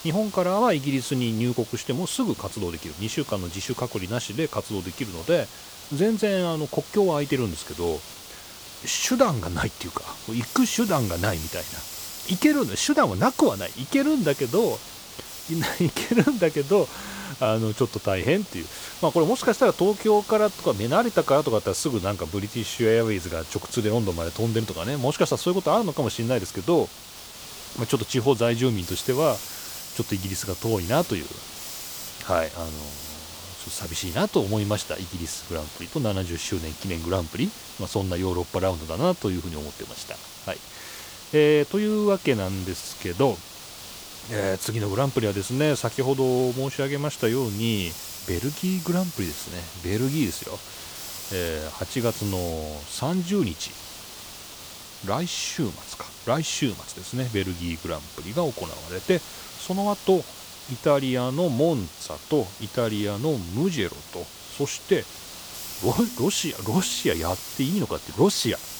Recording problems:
hiss; noticeable; throughout; 10 dB below the speech

